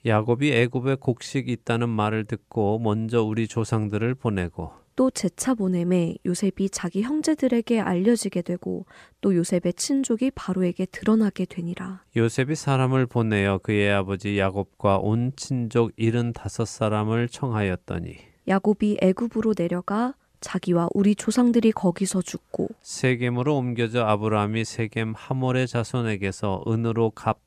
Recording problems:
none

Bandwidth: 14.5 kHz